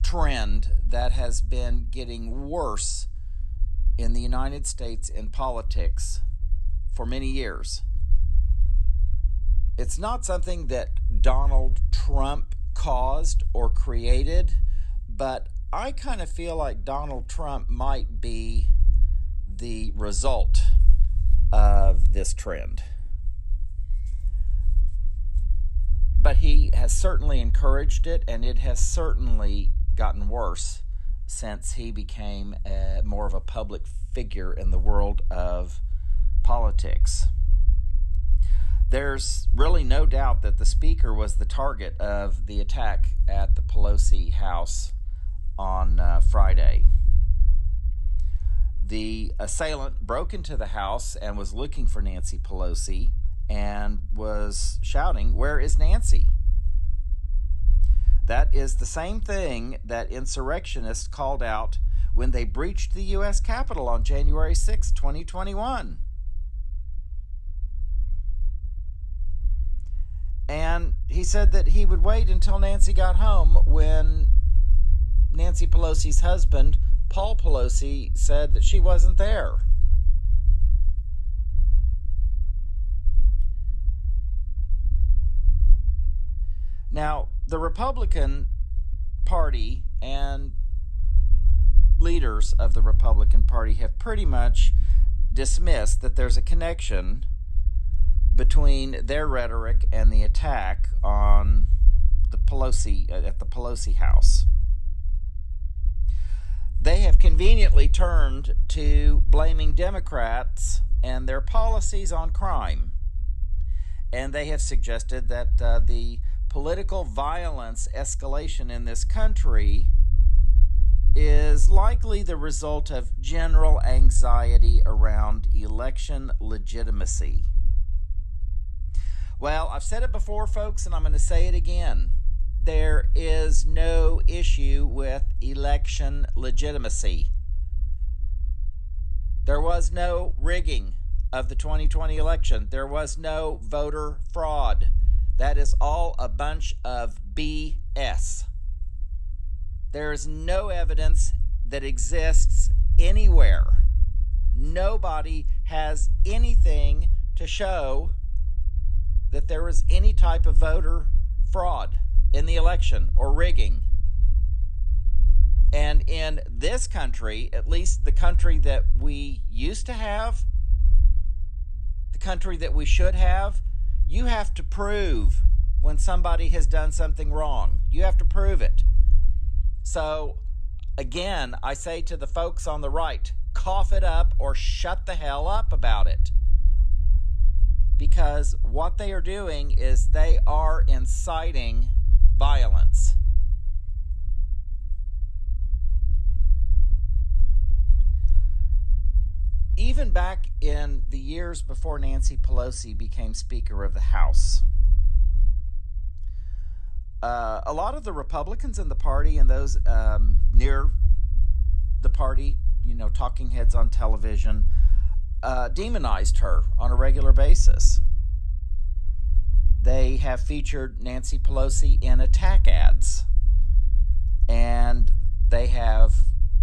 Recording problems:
low rumble; noticeable; throughout; 20 dB below the speech

